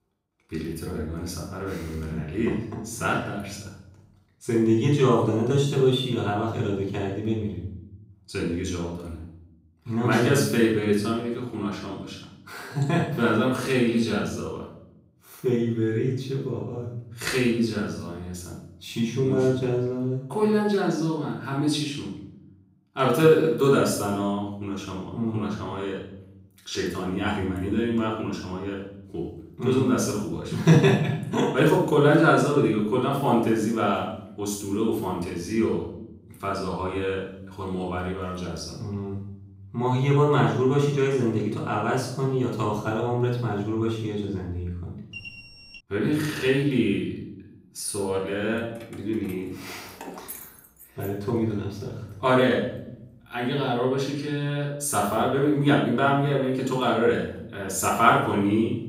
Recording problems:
off-mic speech; far
room echo; noticeable; dies away in 0.7 s
alarm; faint; at 45 s; peak 15 dB below the speech
jangling keys; faint; from 49 to 53 s; peak 15 dB below the speech

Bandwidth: 15.5 kHz